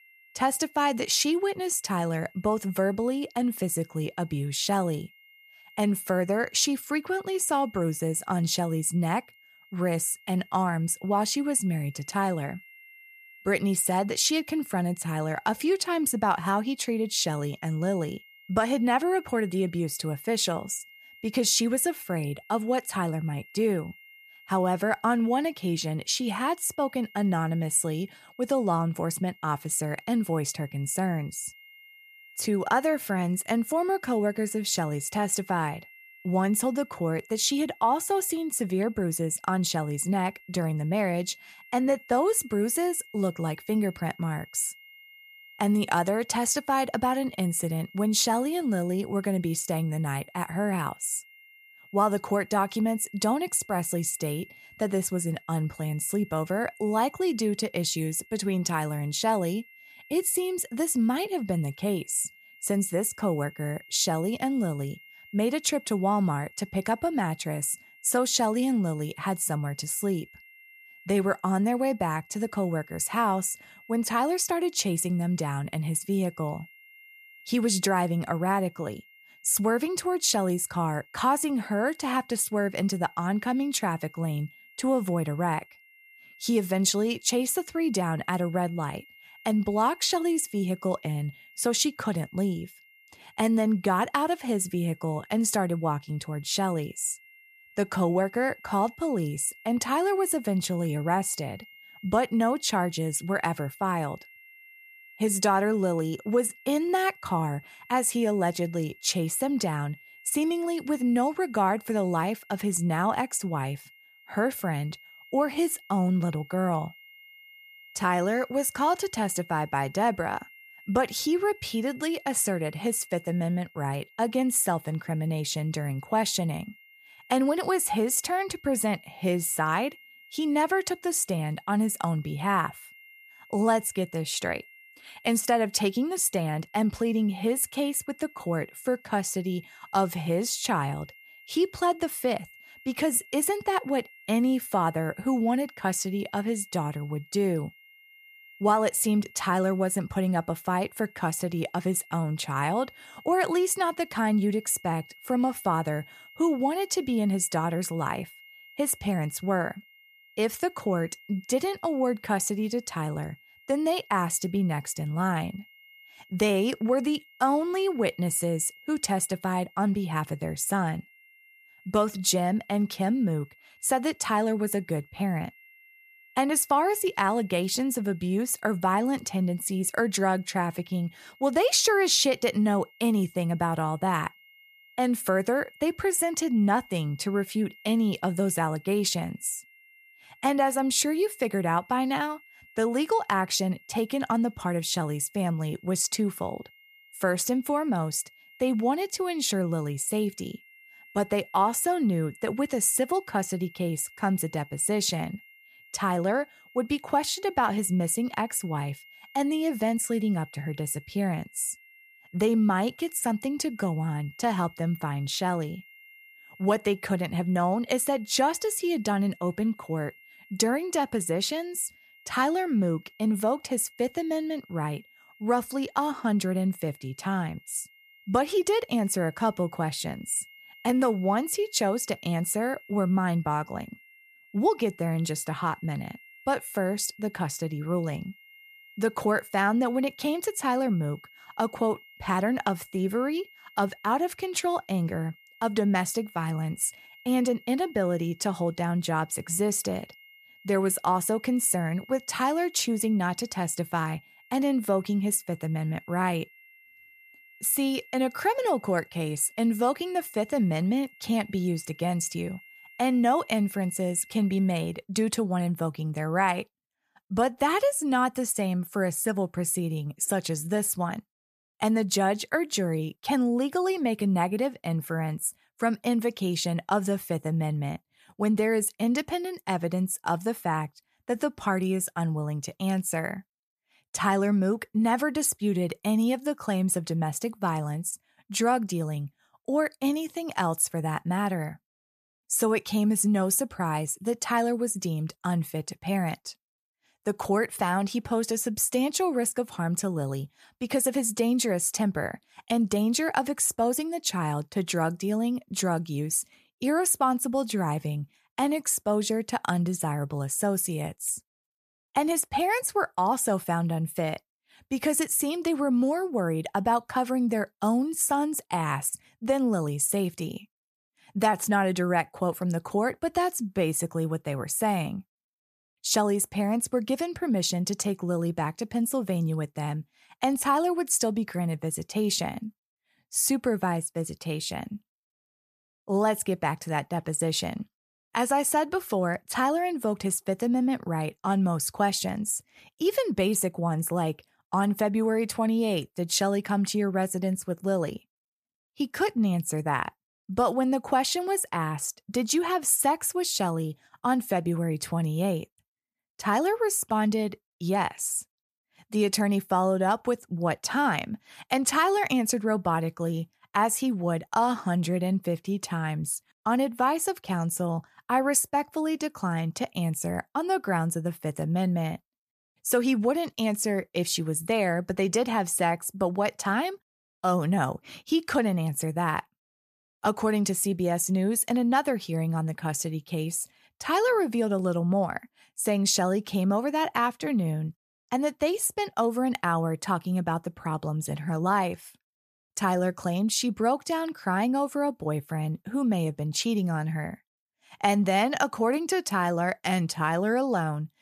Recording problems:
high-pitched whine; faint; until 4:25; 2 kHz, 25 dB below the speech

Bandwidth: 14.5 kHz